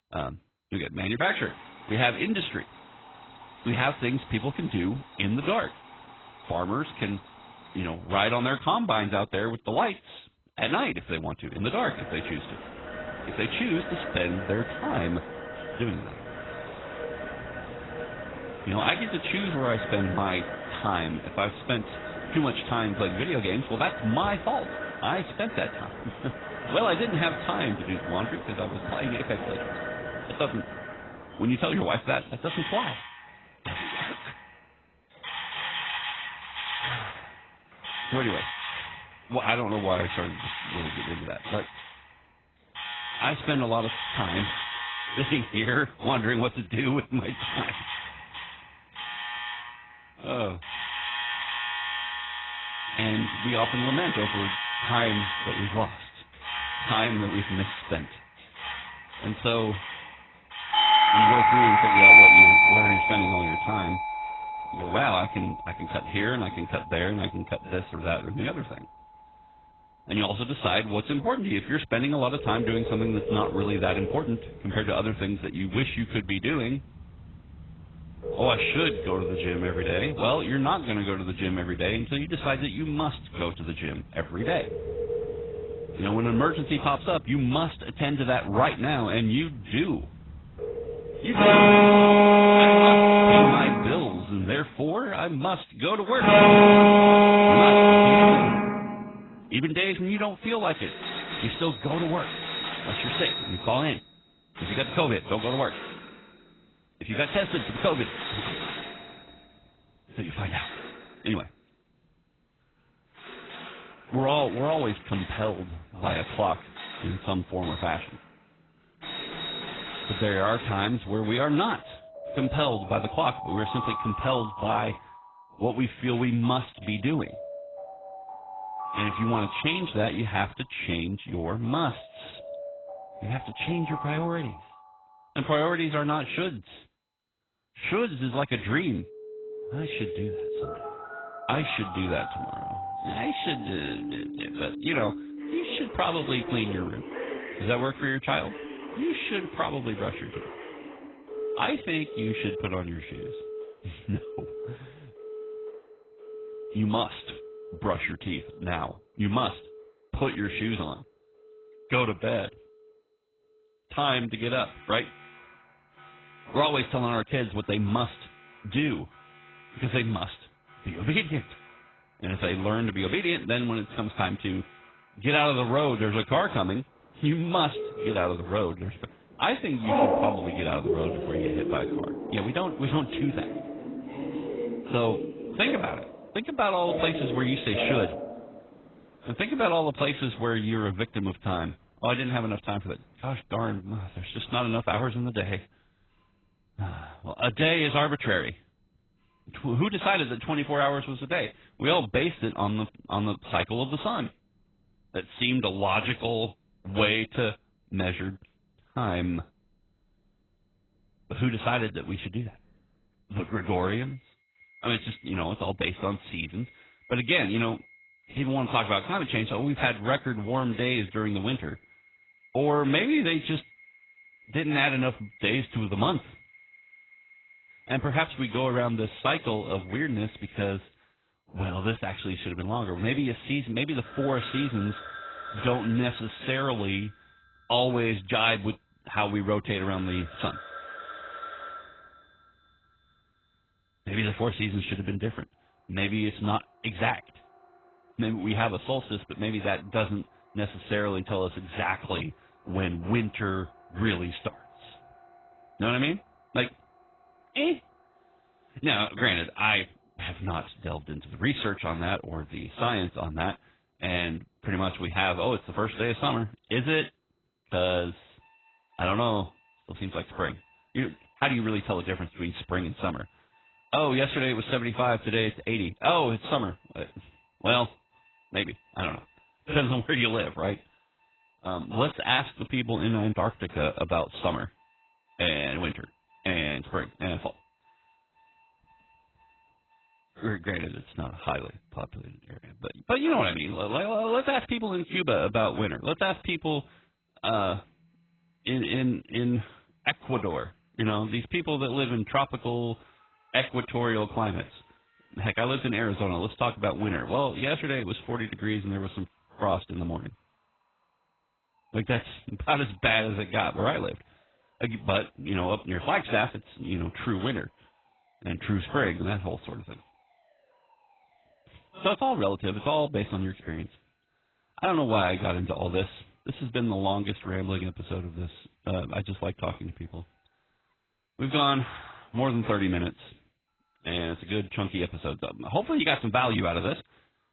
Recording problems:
garbled, watery; badly; nothing above 4 kHz
alarms or sirens; very loud; throughout; 4 dB above the speech
high-pitched whine; very faint; throughout; 4 kHz, 60 dB below the speech

